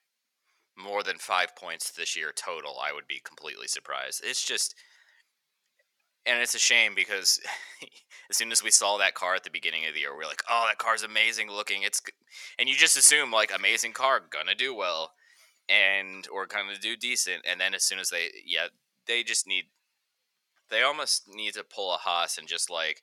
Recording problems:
thin; very; fading below 900 Hz

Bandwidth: 18 kHz